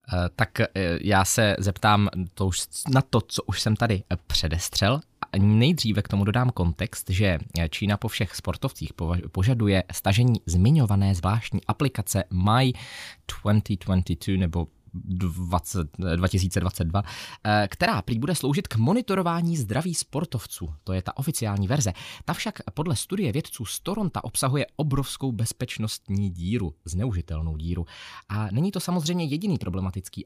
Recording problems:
none

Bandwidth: 15 kHz